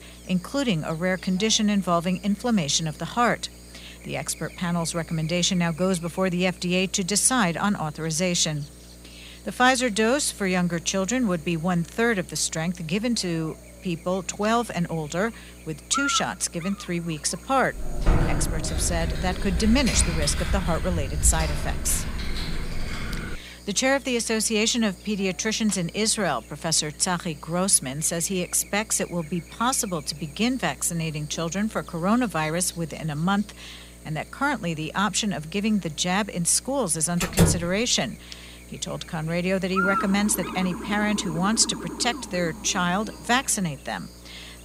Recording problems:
electrical hum; noticeable; throughout; 60 Hz, 15 dB below the speech
keyboard typing; loud; from 18 to 23 s; peak 1 dB above the speech
door banging; loud; at 37 s; peak 2 dB above the speech
siren; noticeable; from 40 to 44 s; peak 10 dB below the speech

